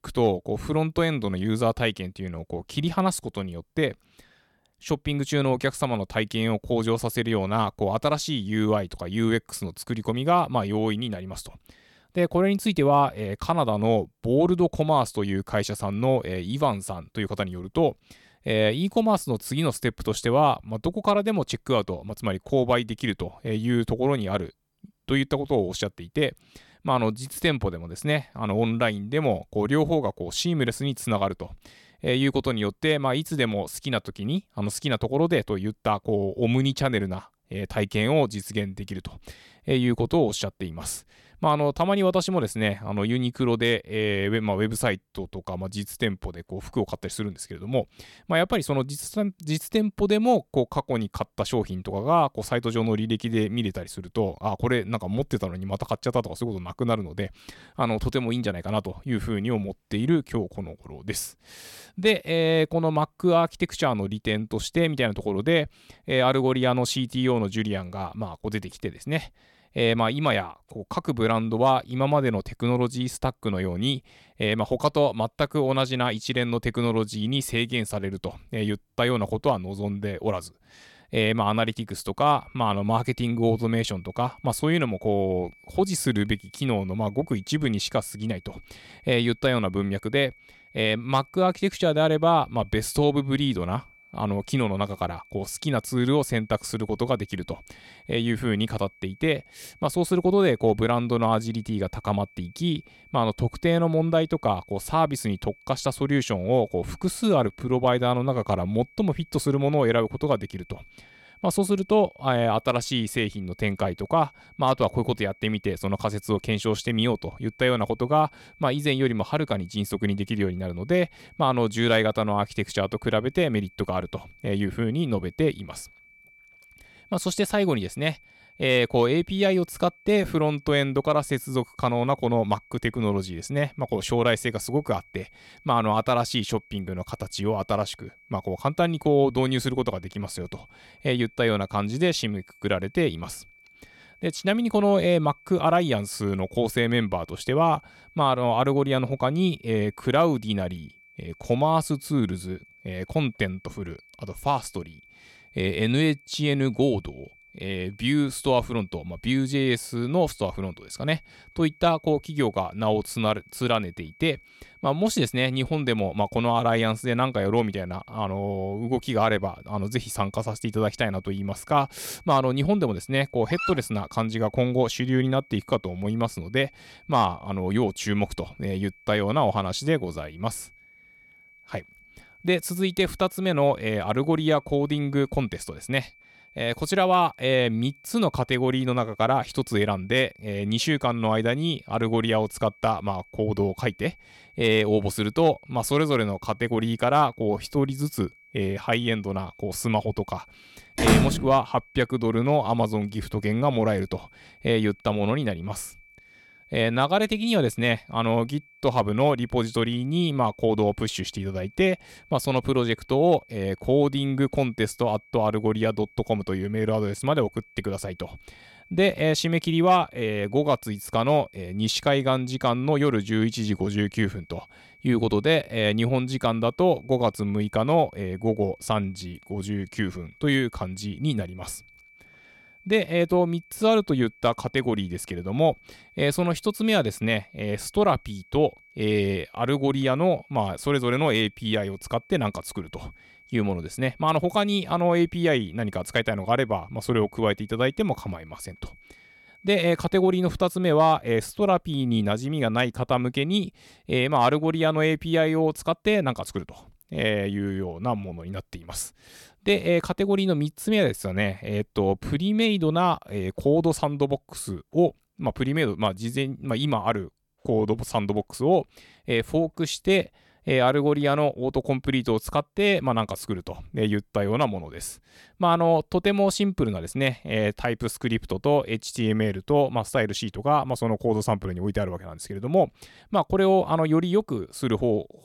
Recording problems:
high-pitched whine; faint; from 1:22 to 4:10; 2.5 kHz, 25 dB below the speech
dog barking; noticeable; at 2:53; peak 6 dB below the speech
door banging; loud; at 3:21; peak 5 dB above the speech

